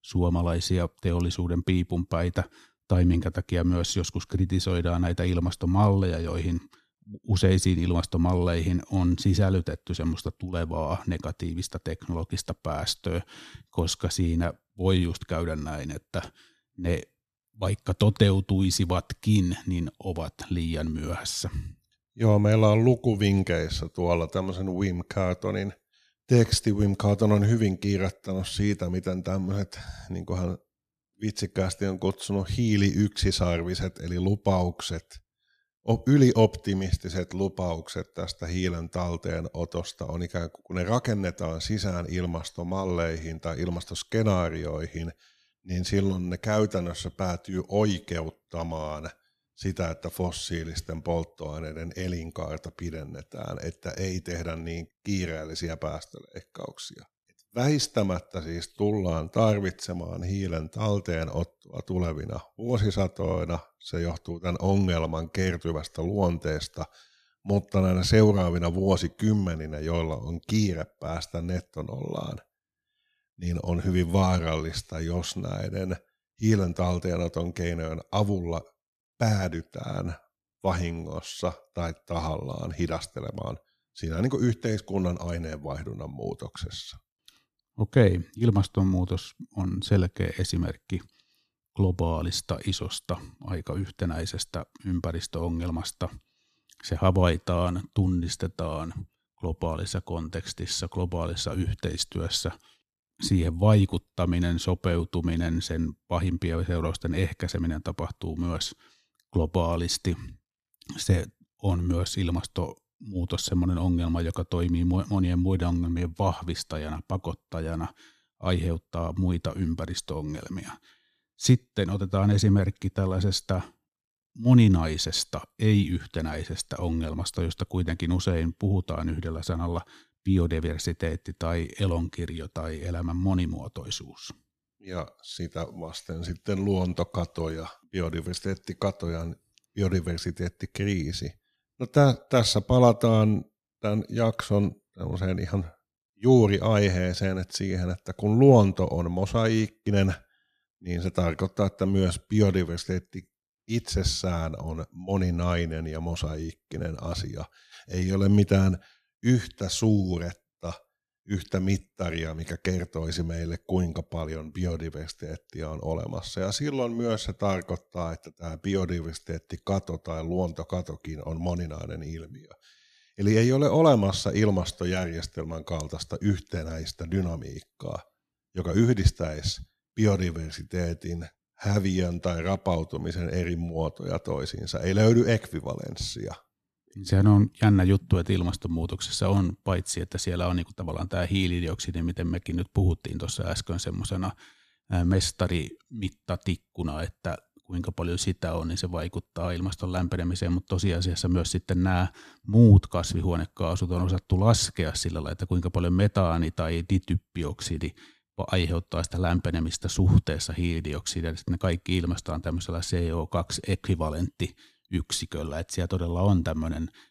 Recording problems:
uneven, jittery; slightly; from 1:03 to 3:21

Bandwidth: 14.5 kHz